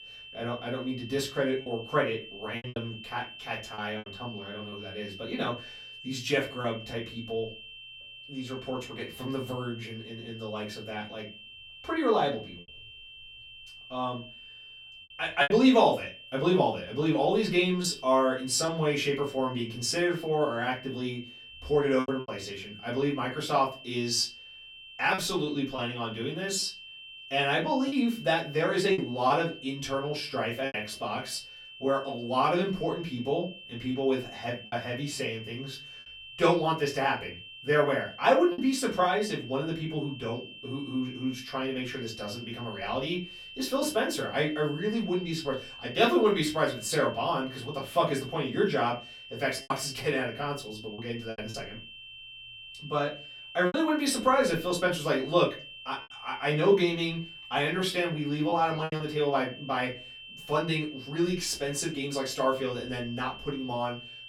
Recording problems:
off-mic speech; far
room echo; very slight; dies away in 0.3 s
high-pitched whine; noticeable; throughout; 3 kHz, 15 dB below the speech
choppy; occasionally; 3% of the speech affected

